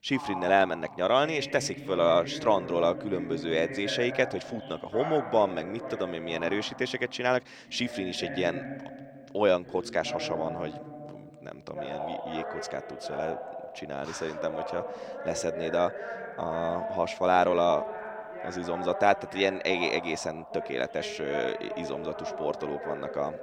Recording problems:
voice in the background; loud; throughout; 9 dB below the speech

